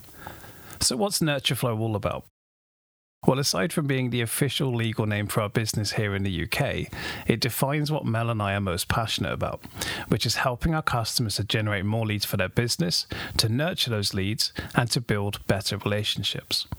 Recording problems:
squashed, flat; somewhat

